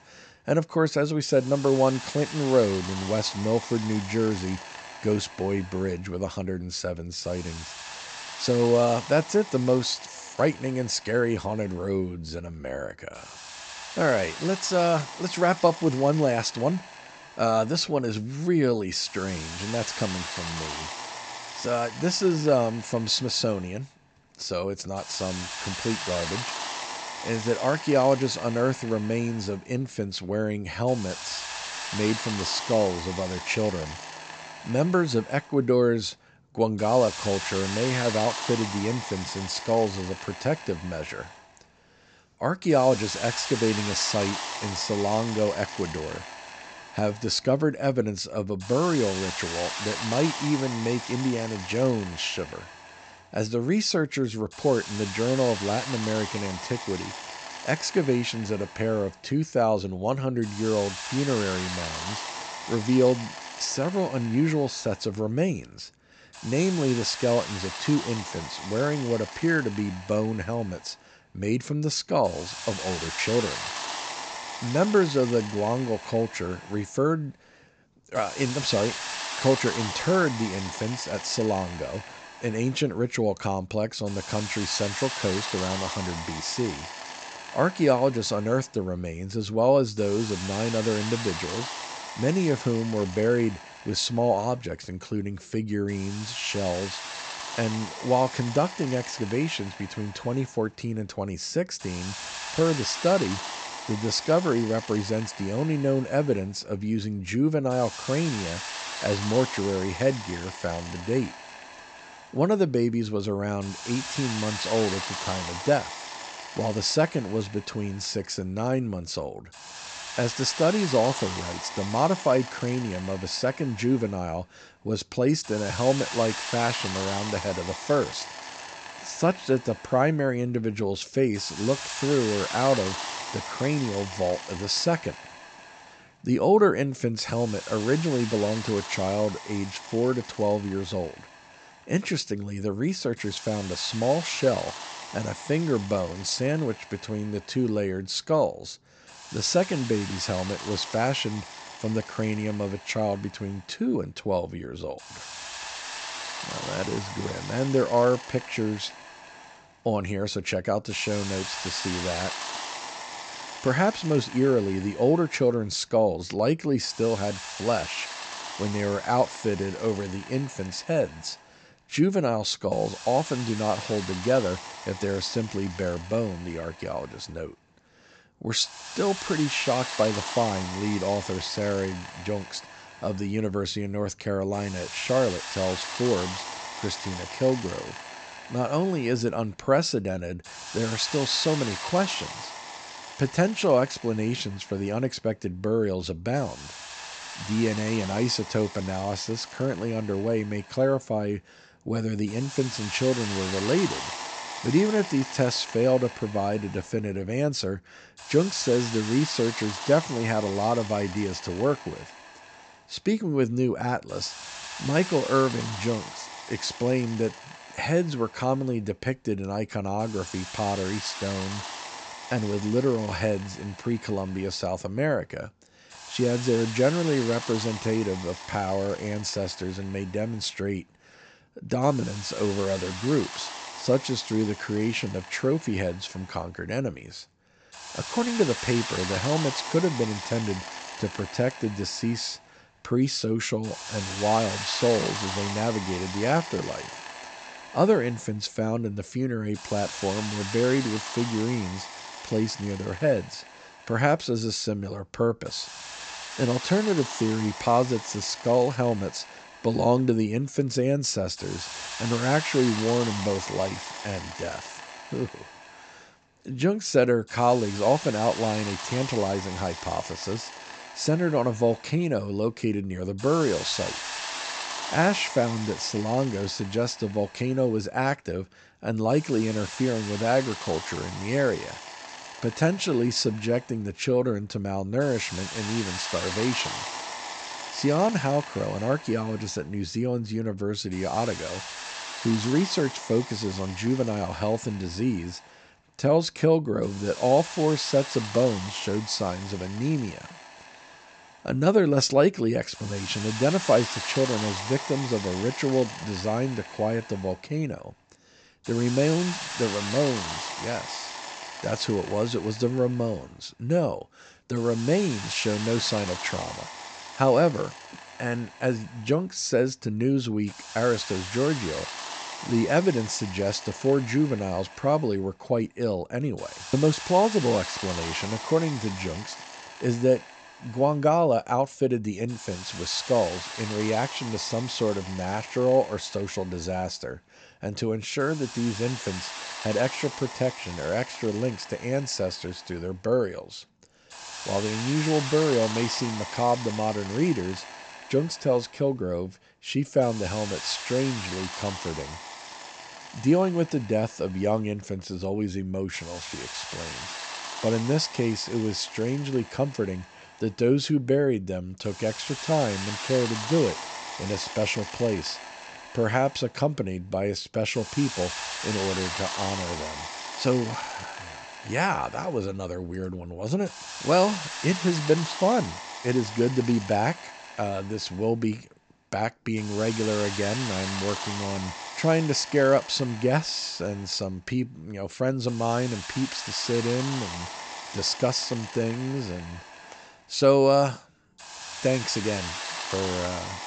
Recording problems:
high frequencies cut off; noticeable; nothing above 8 kHz
hiss; loud; throughout; 9 dB below the speech

